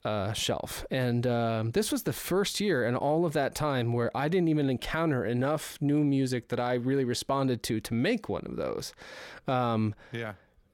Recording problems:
none

